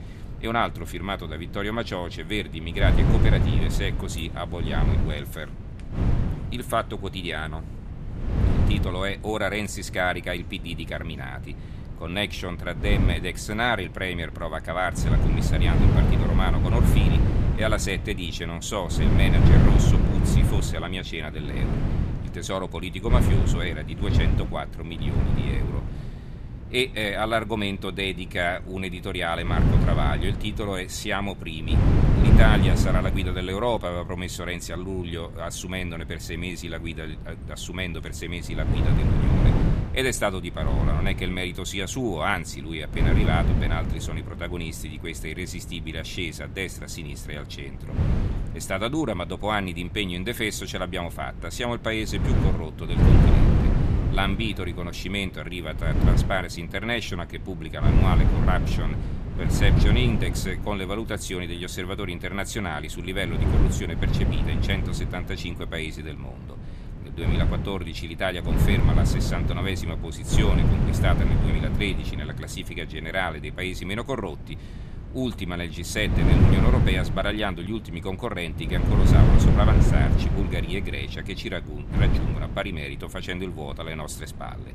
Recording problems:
wind noise on the microphone; heavy; 4 dB below the speech

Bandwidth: 14 kHz